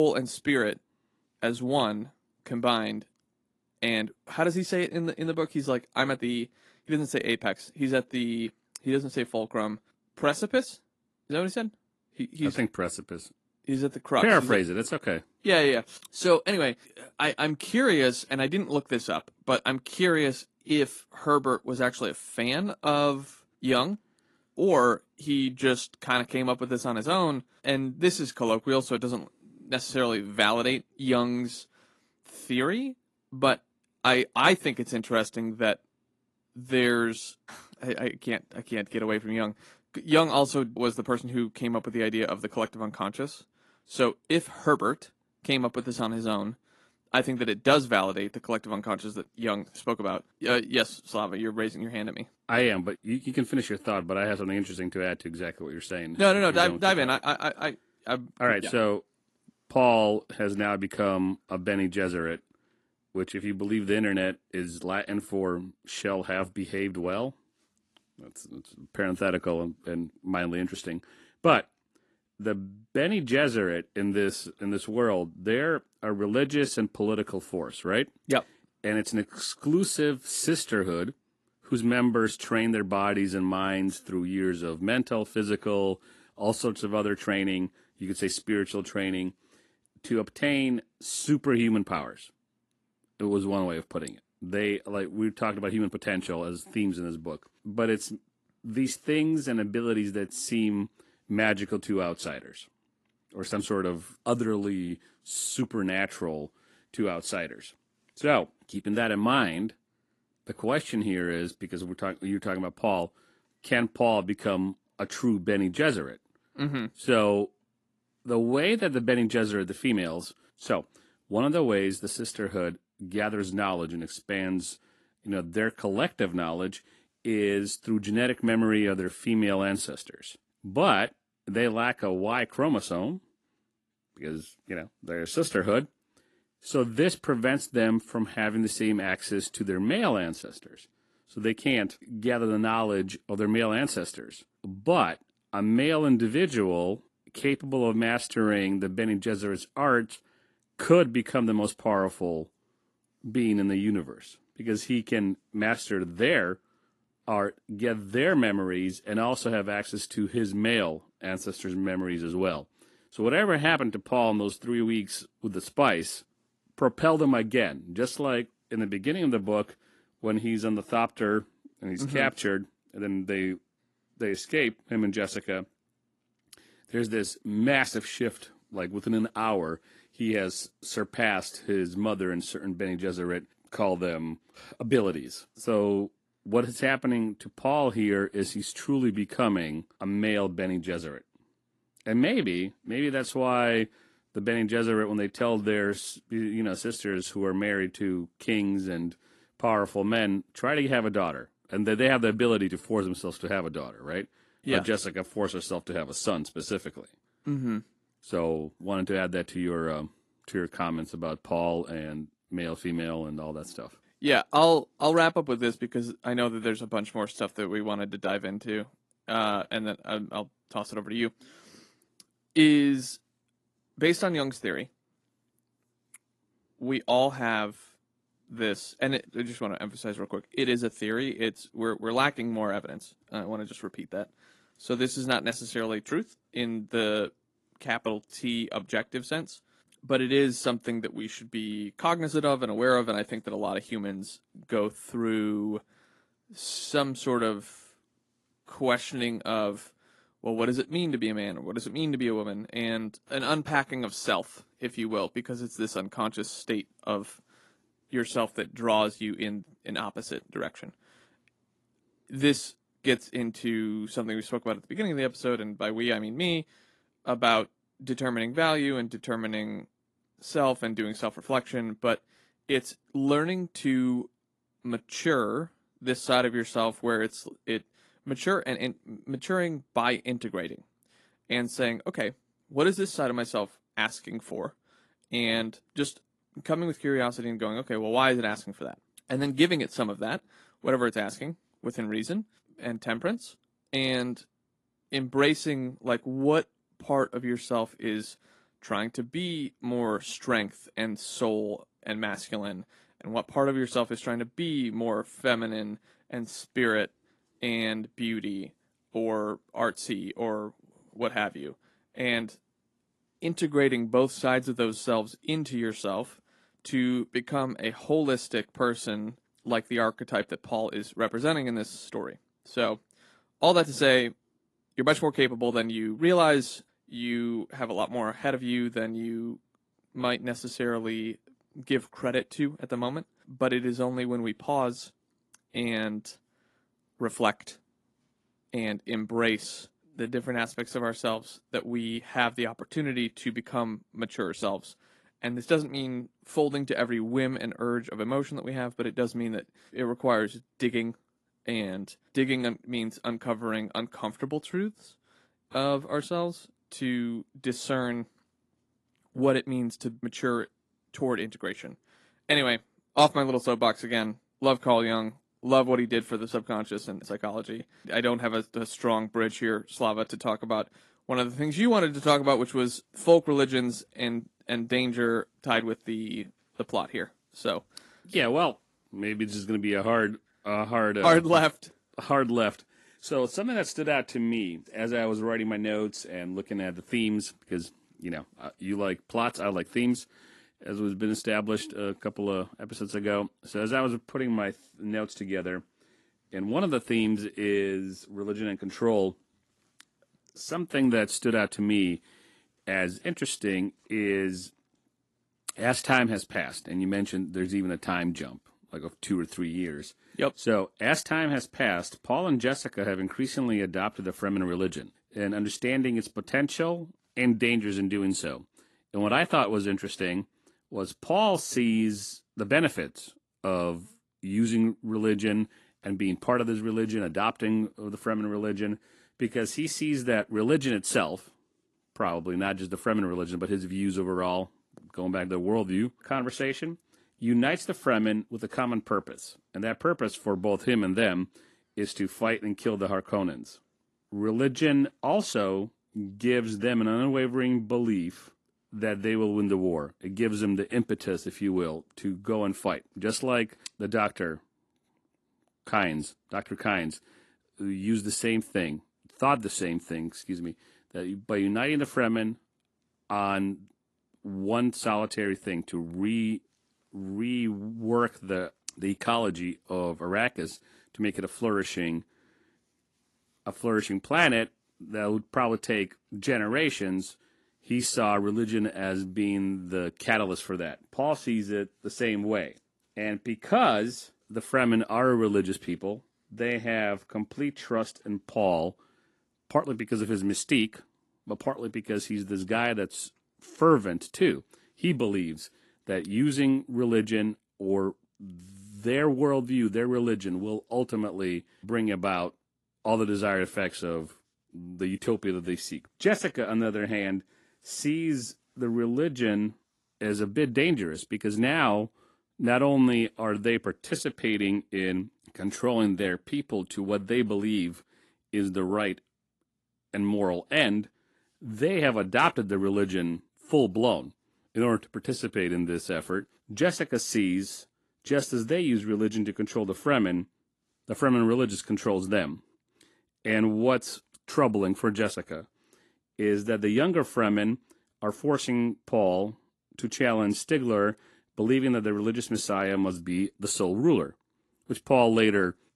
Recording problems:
garbled, watery; slightly; nothing above 11.5 kHz
abrupt cut into speech; at the start

